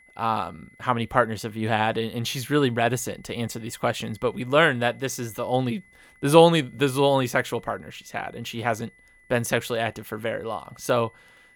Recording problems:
high-pitched whine; faint; throughout; 2 kHz, 30 dB below the speech

